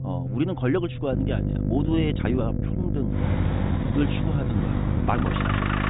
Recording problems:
high frequencies cut off; severe; nothing above 4 kHz
electrical hum; loud; from 1 s on; 50 Hz, 5 dB below the speech
traffic noise; loud; from 3 s on; 2 dB below the speech
low rumble; noticeable; throughout; 10 dB below the speech
uneven, jittery; strongly; from 0.5 to 5.5 s

